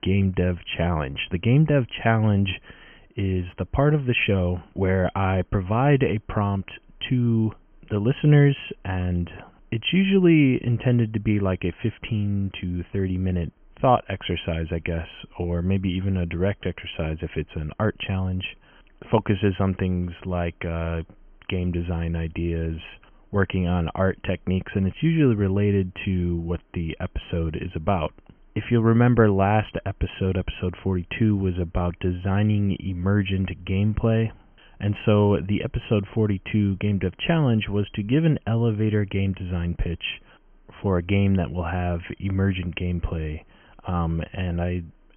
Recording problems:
high frequencies cut off; severe; nothing above 3 kHz

